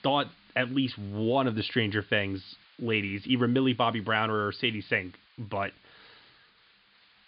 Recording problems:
high frequencies cut off; severe; nothing above 5 kHz
hiss; faint; throughout; 30 dB below the speech

